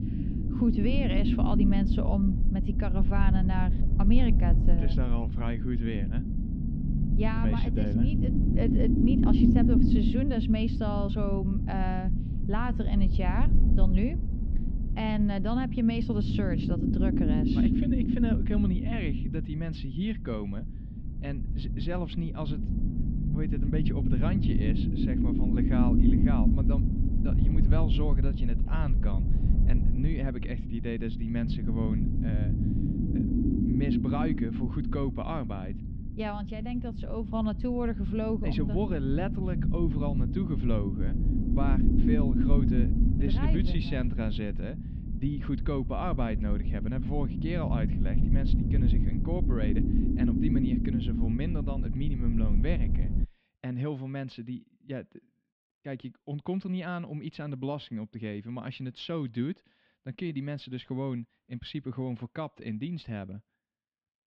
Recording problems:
muffled; very; fading above 3 kHz
low rumble; loud; until 53 s; as loud as the speech

